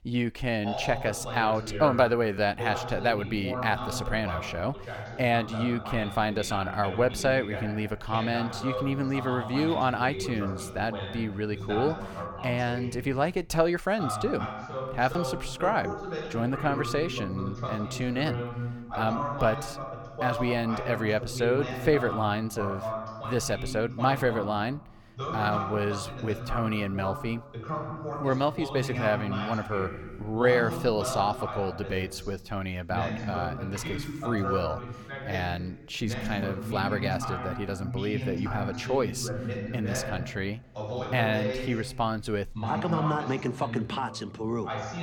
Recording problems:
voice in the background; loud; throughout; 6 dB below the speech

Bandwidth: 18 kHz